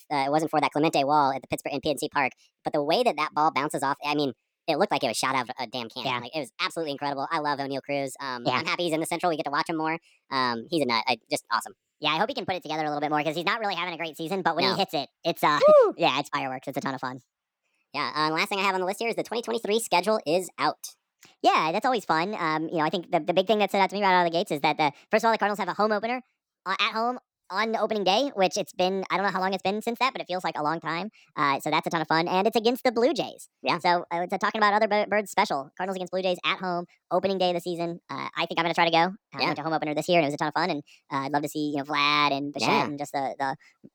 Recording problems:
wrong speed and pitch; too fast and too high; 1.5 times normal speed

